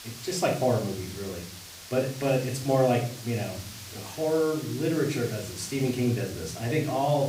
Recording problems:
off-mic speech; far
room echo; slight; dies away in 0.5 s
hiss; noticeable; throughout; 15 dB below the speech

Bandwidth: 15.5 kHz